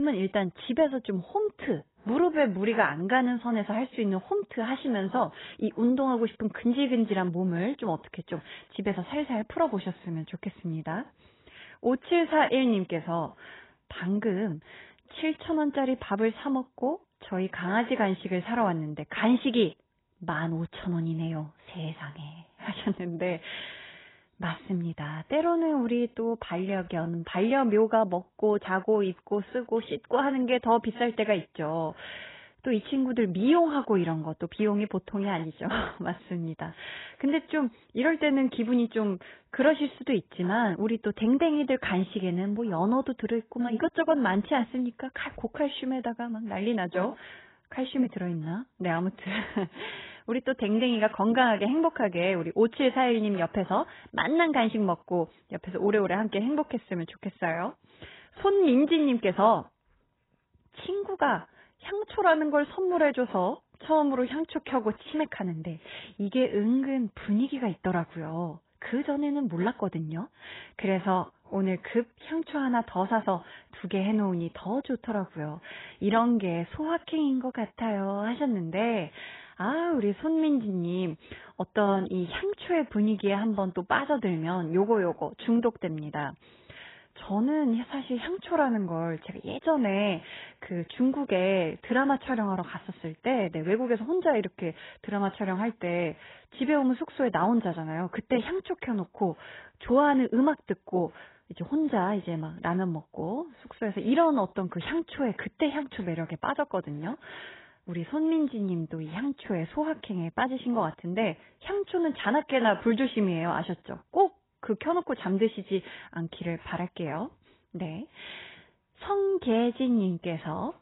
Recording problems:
garbled, watery; badly; nothing above 3.5 kHz
abrupt cut into speech; at the start

